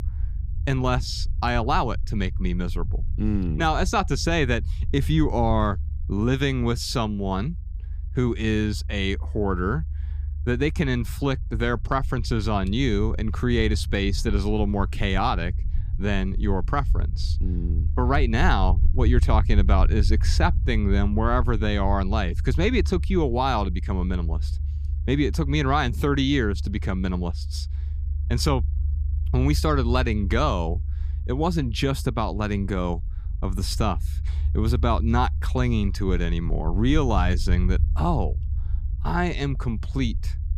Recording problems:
low rumble; noticeable; throughout; 20 dB below the speech

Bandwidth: 15 kHz